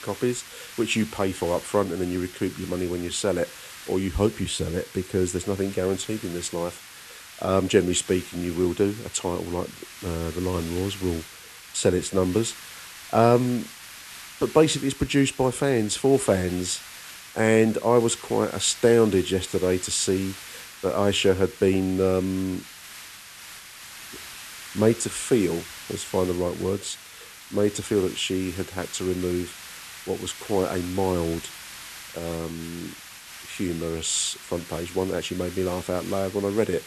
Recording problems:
hiss; noticeable; throughout; 15 dB below the speech

